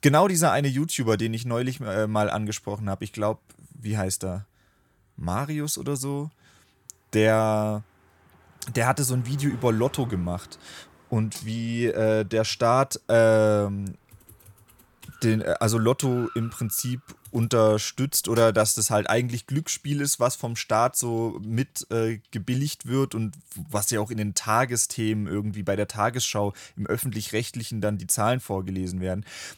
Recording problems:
traffic noise; faint; throughout; 25 dB below the speech

